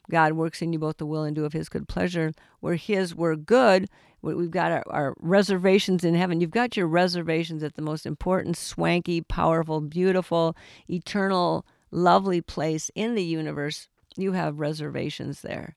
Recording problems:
none

